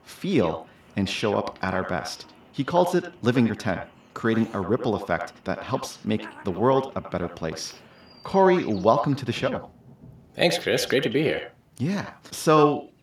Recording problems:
echo of what is said; strong; throughout; 90 ms later, 10 dB below the speech
animal sounds; faint; throughout; 25 dB below the speech
rain or running water; faint; throughout; 30 dB below the speech

